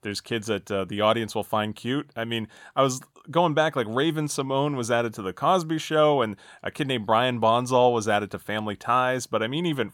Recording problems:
none

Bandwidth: 17 kHz